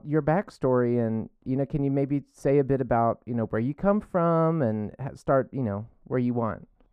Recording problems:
muffled; very; fading above 2 kHz

